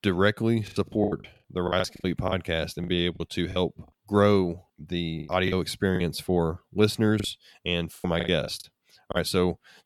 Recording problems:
choppy; very; from 0.5 to 3.5 s, from 5.5 to 7 s and from 8 to 9 s; 15% of the speech affected

